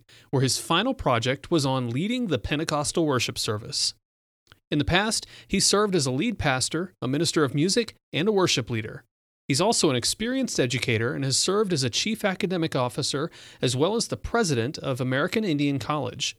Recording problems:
none

